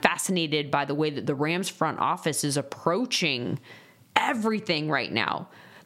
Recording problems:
squashed, flat; somewhat

